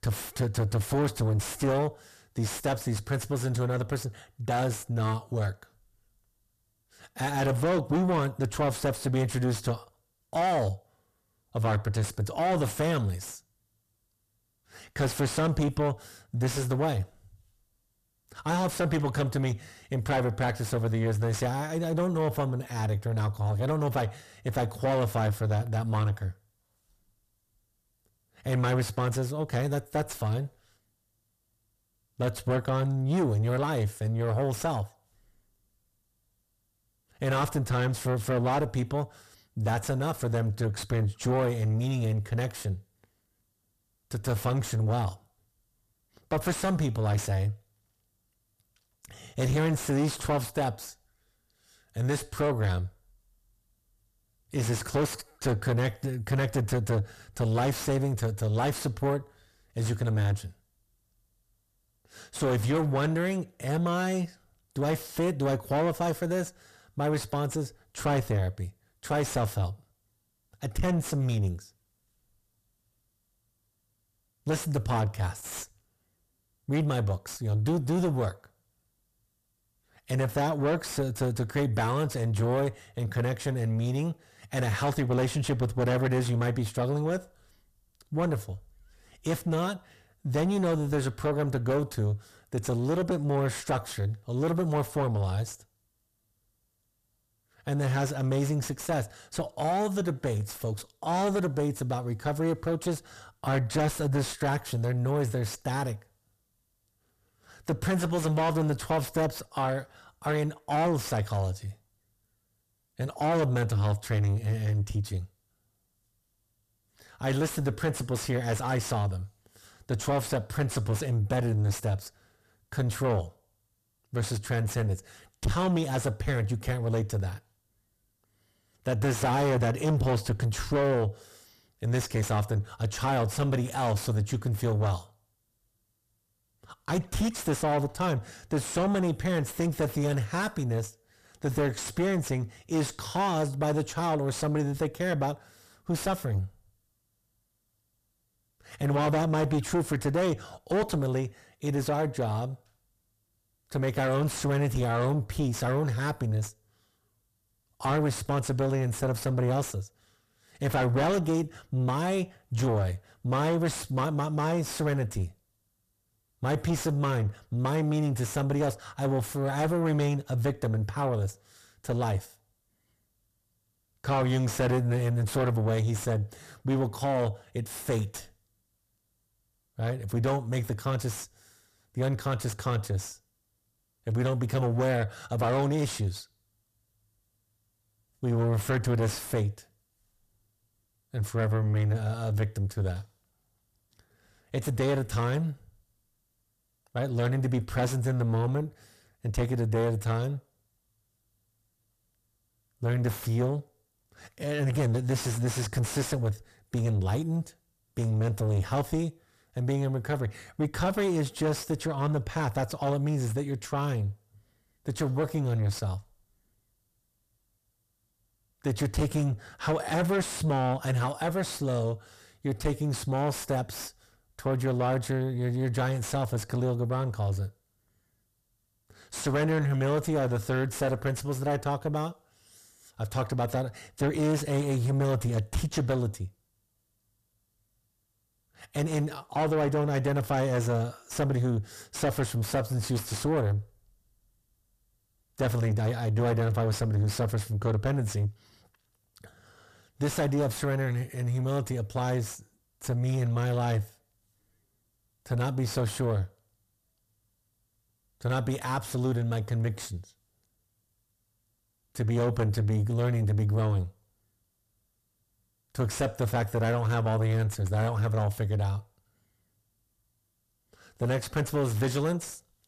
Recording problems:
distortion; heavy; 5 dB below the speech

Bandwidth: 14.5 kHz